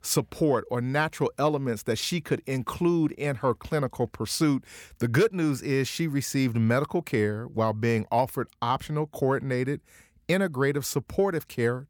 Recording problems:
none

